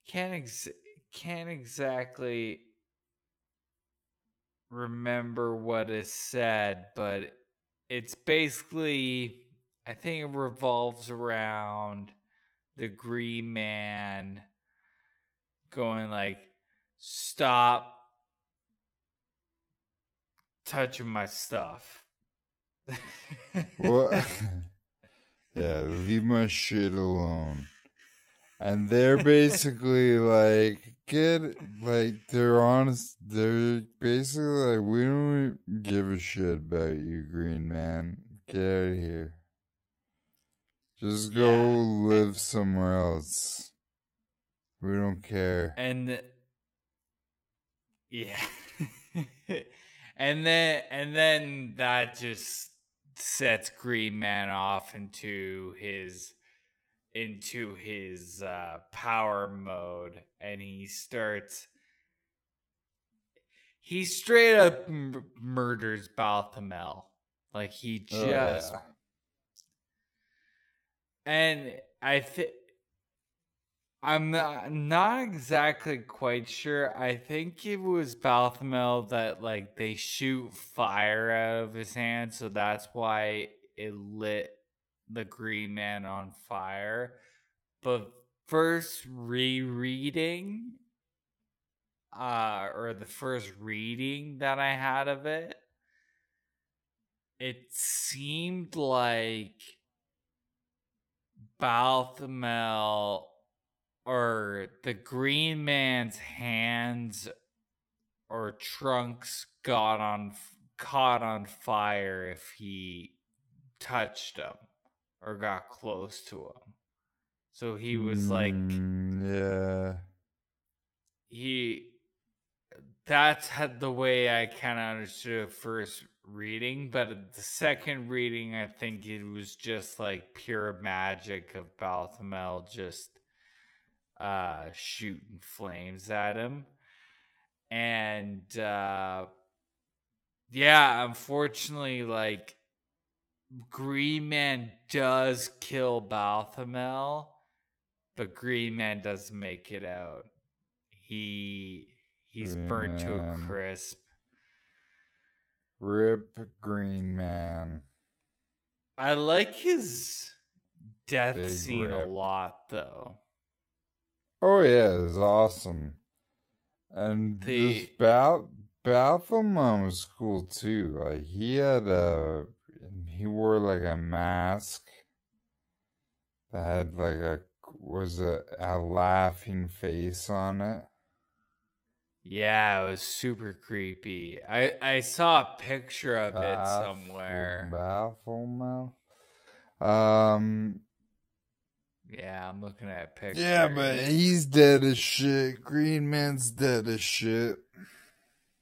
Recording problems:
wrong speed, natural pitch; too slow; 0.5 times normal speed

